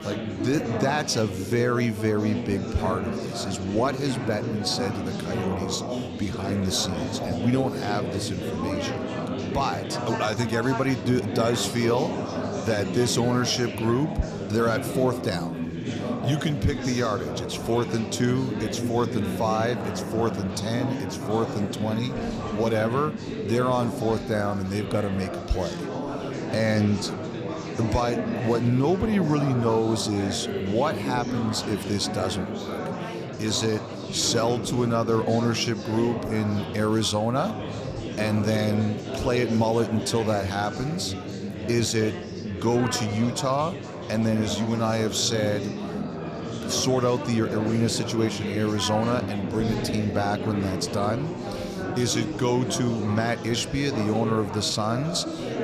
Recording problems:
chatter from many people; loud; throughout; 5 dB below the speech

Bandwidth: 14.5 kHz